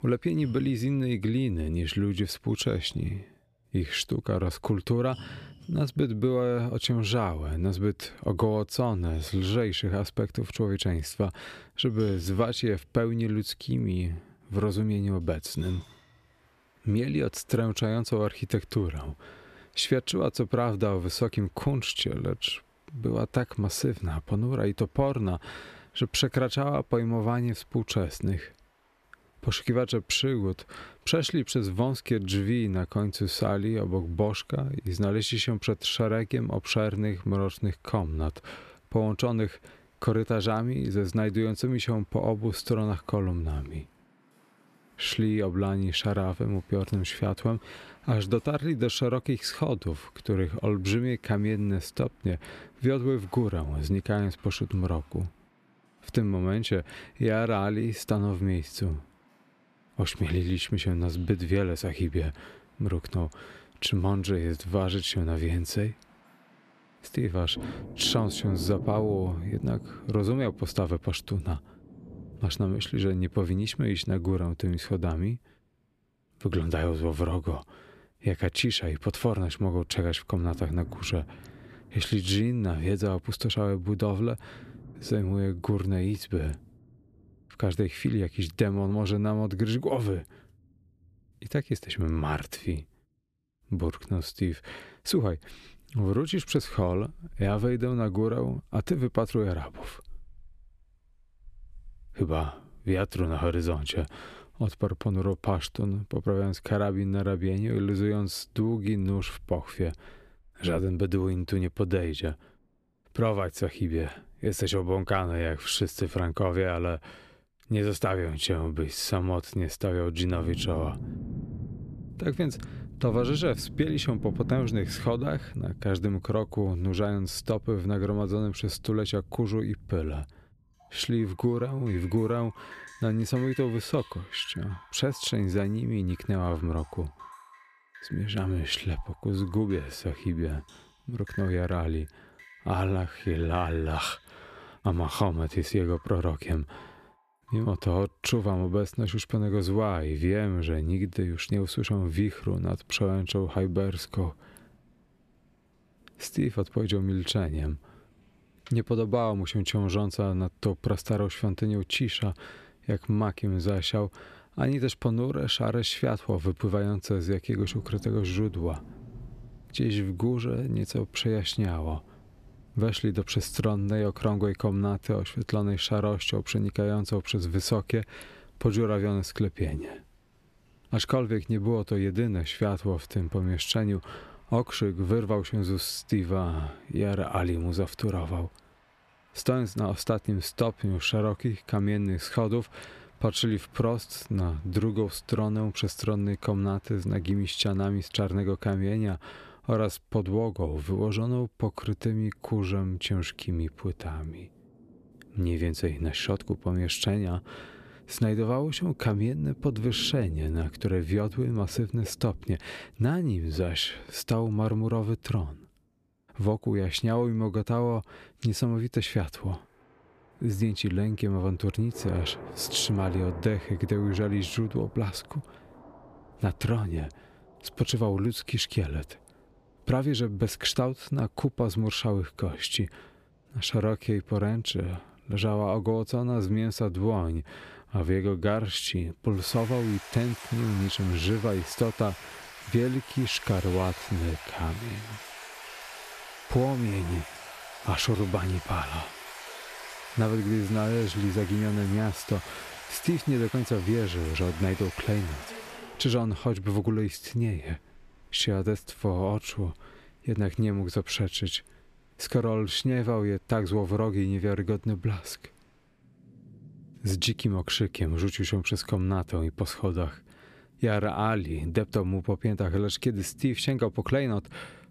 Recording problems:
rain or running water; noticeable; throughout; 15 dB below the speech

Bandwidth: 14.5 kHz